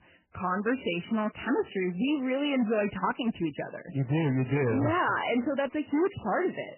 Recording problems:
garbled, watery; badly; nothing above 3 kHz
distortion; slight; 13% of the sound clipped

